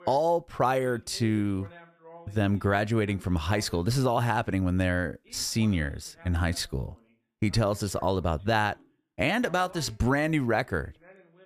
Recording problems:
voice in the background; faint; throughout; 25 dB below the speech

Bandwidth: 14.5 kHz